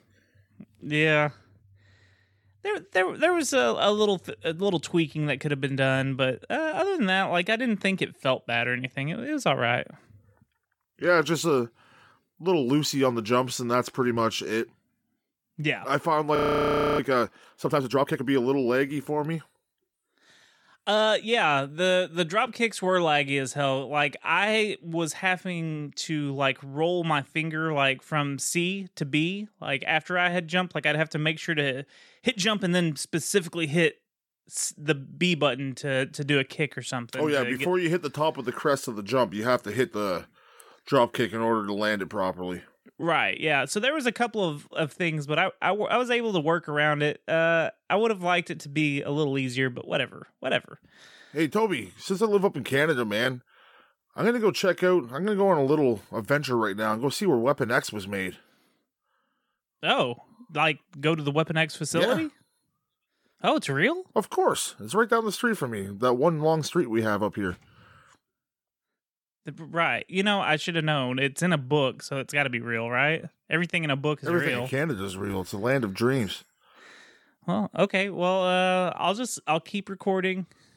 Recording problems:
audio freezing; at 16 s for 0.5 s

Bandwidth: 17 kHz